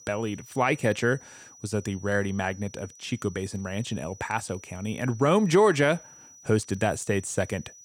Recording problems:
high-pitched whine; faint; throughout; 6 kHz, 20 dB below the speech

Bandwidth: 17.5 kHz